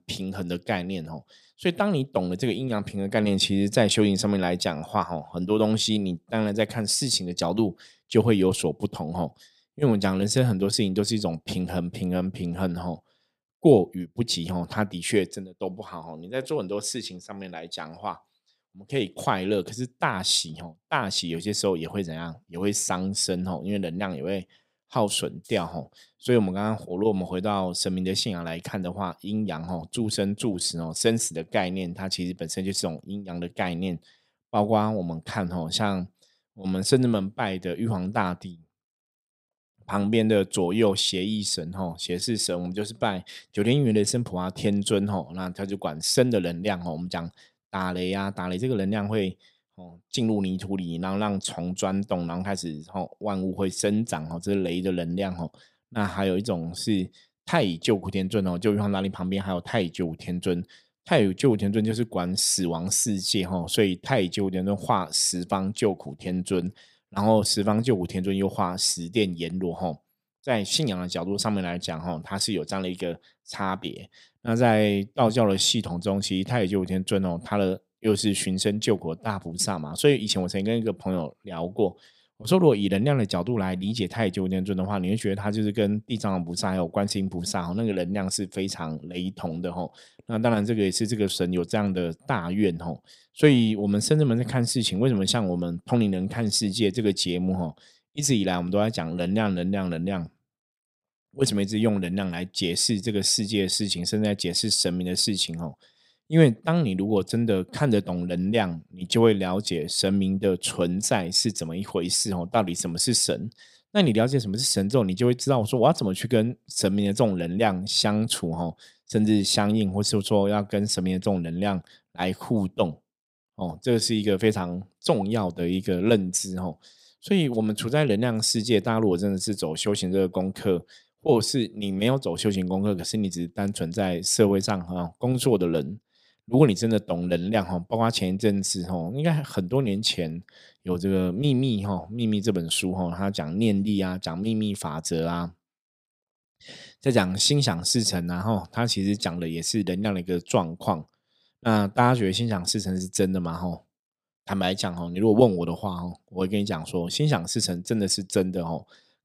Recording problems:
none

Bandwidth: 15.5 kHz